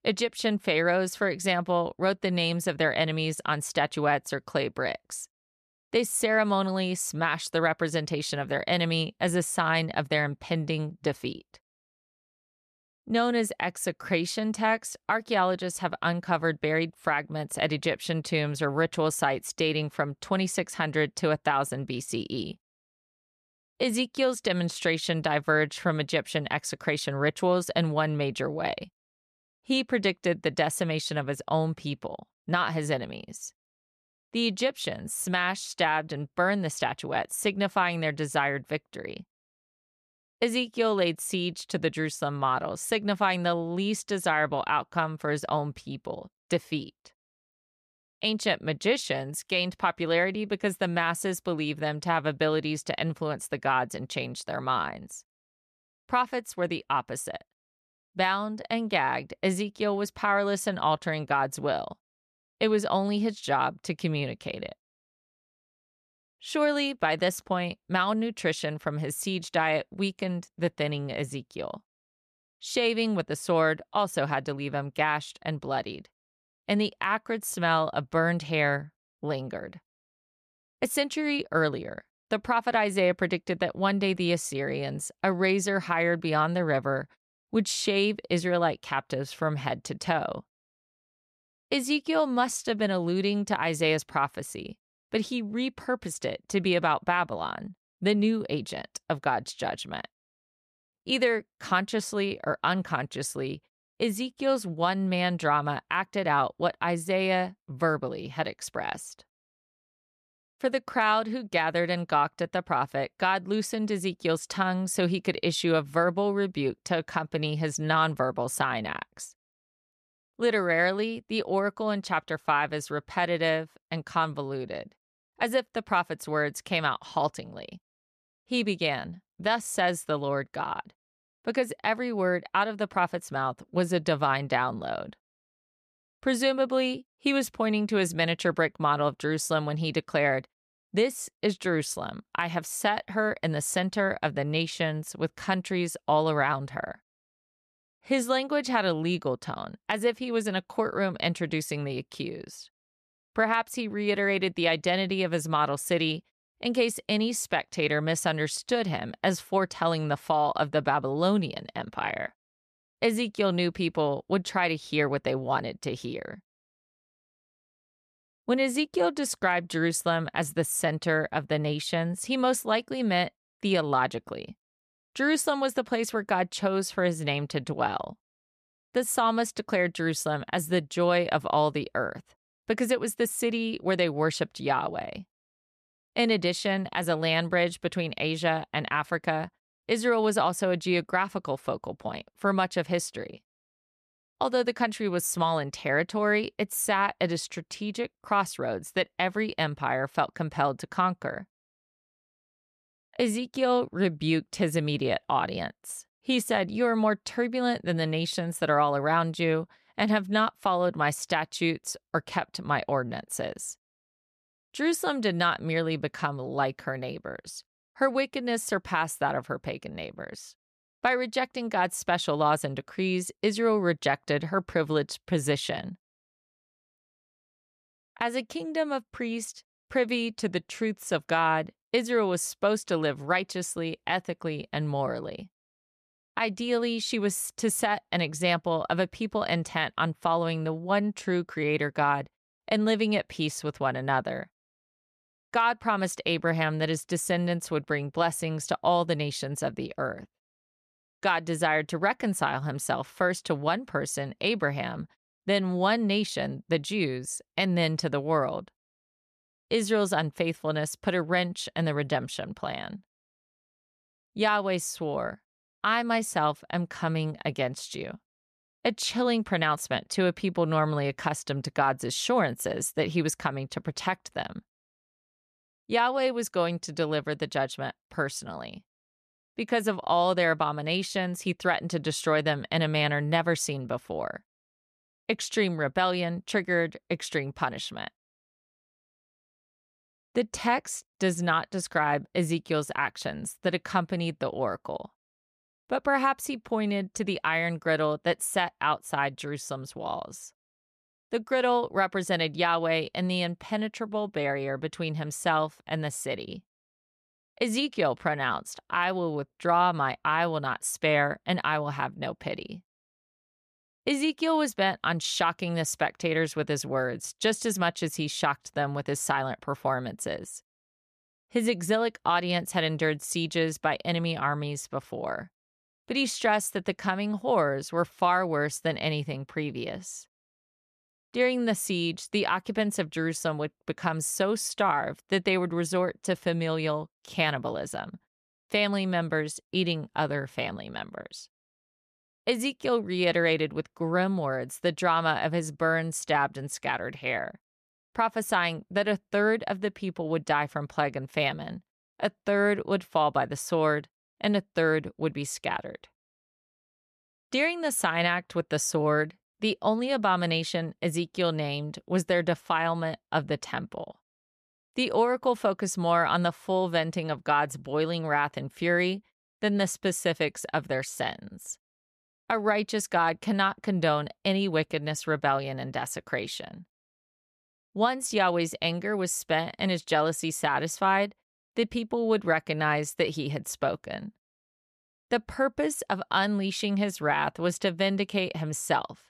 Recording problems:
none

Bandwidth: 14.5 kHz